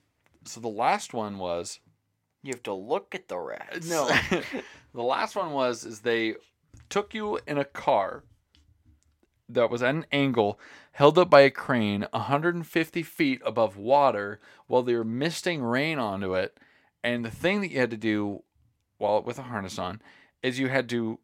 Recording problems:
none

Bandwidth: 16.5 kHz